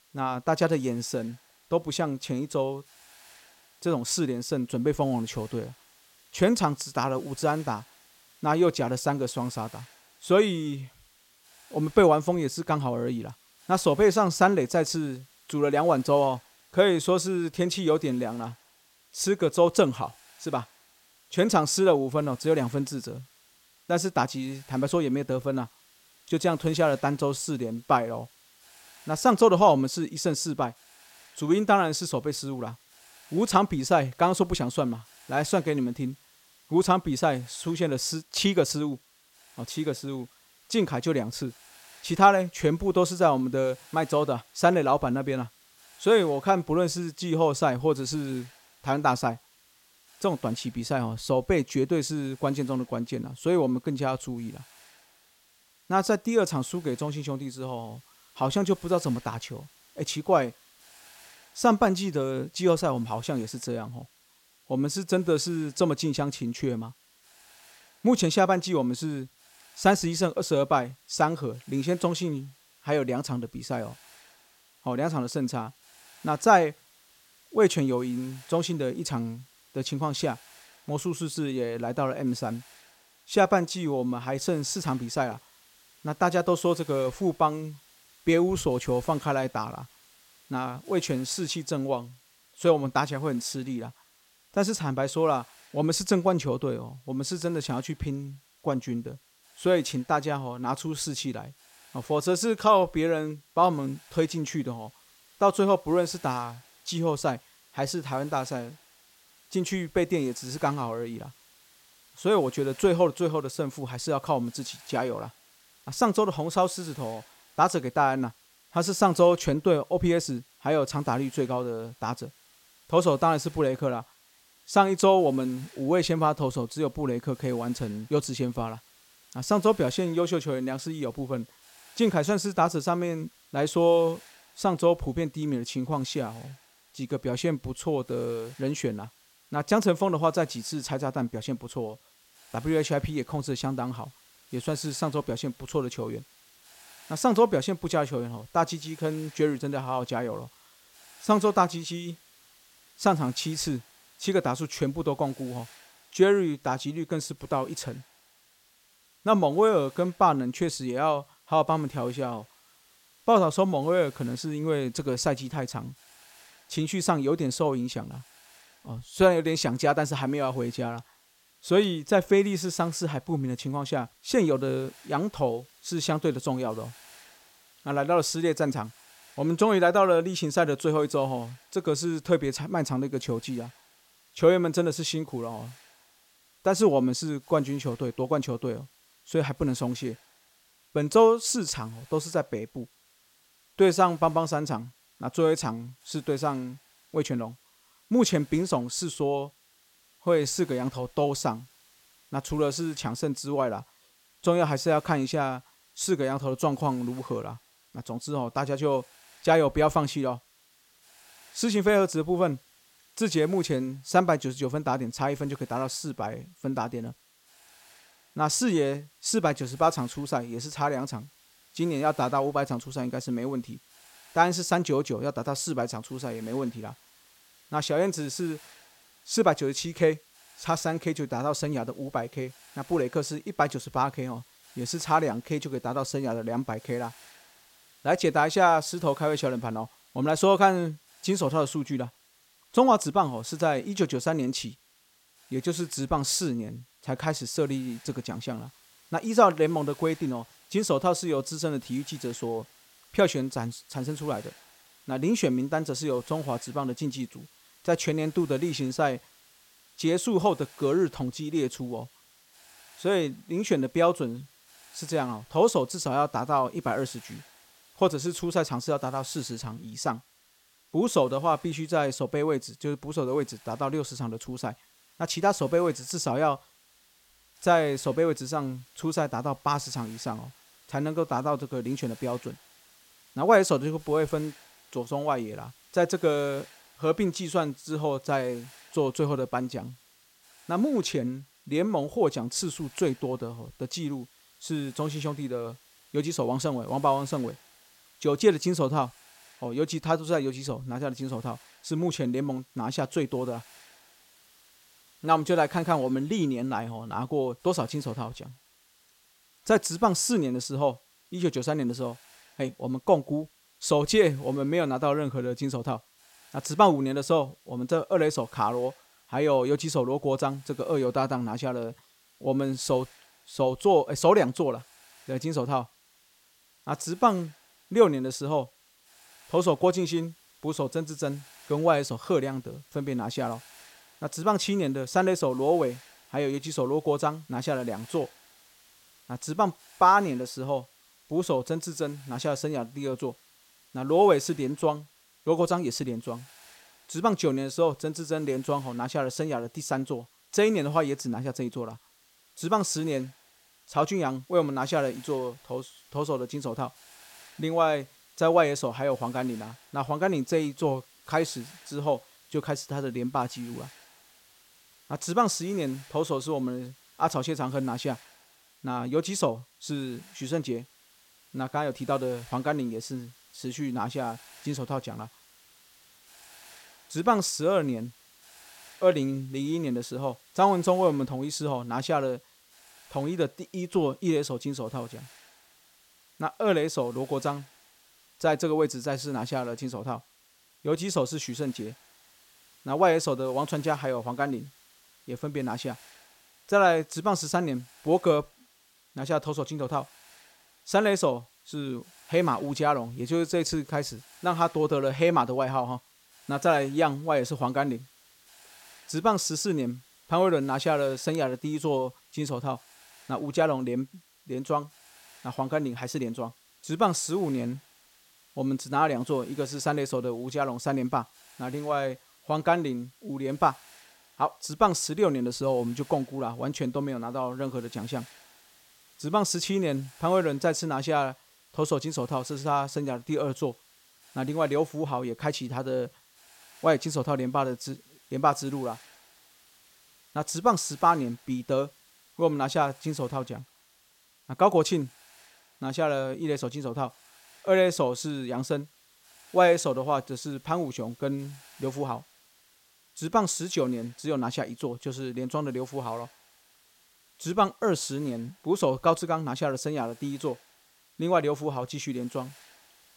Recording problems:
hiss; faint; throughout; 25 dB below the speech

